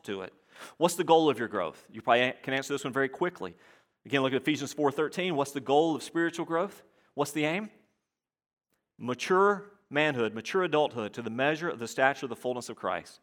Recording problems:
none

